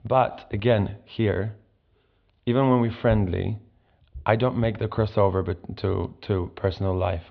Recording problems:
muffled; very slightly; fading above 3.5 kHz
high frequencies cut off; slight; nothing above 6.5 kHz

